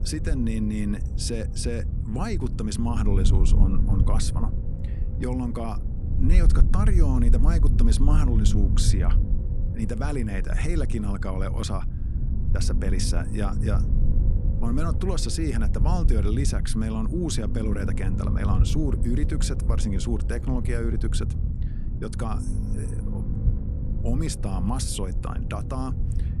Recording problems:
low rumble; loud; throughout; 7 dB below the speech

